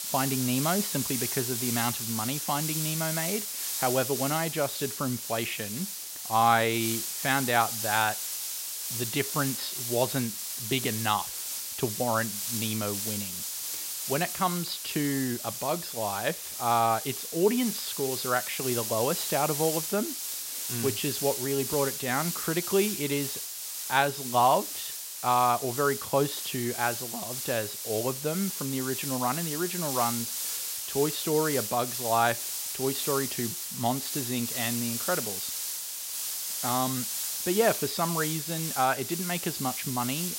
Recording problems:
high frequencies cut off; noticeable; nothing above 5.5 kHz
hiss; loud; throughout; 2 dB below the speech

